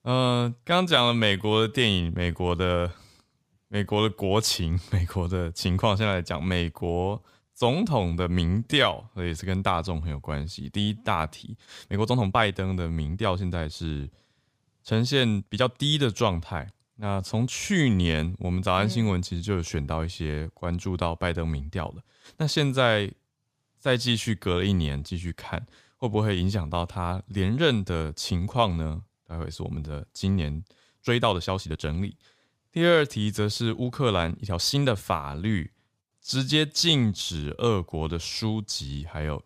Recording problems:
uneven, jittery; strongly; from 0.5 to 38 s

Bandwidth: 15 kHz